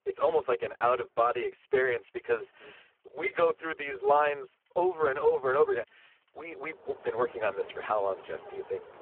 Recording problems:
phone-call audio; poor line
traffic noise; noticeable; throughout; 20 dB below the speech

